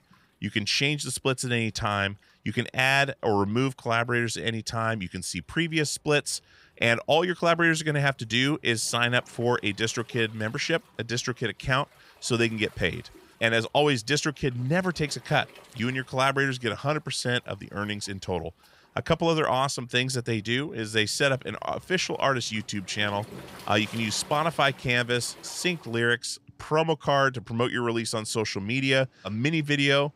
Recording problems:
rain or running water; faint; throughout; 25 dB below the speech

